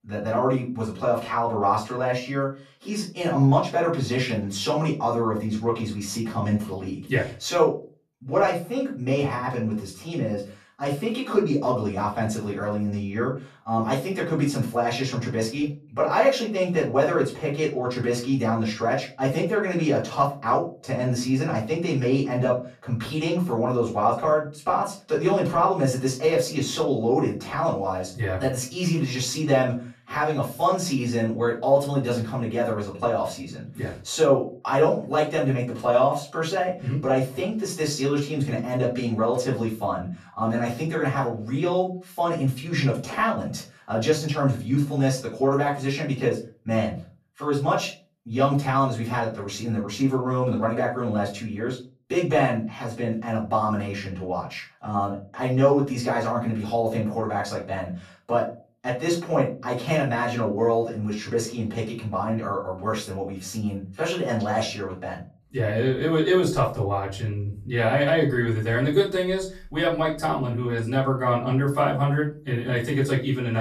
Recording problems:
off-mic speech; far
room echo; slight; dies away in 0.3 s
abrupt cut into speech; at the end

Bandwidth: 14 kHz